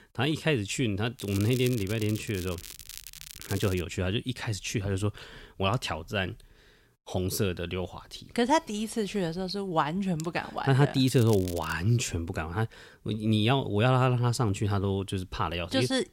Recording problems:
crackling; noticeable; from 1 to 4 s and at 11 s; 15 dB below the speech

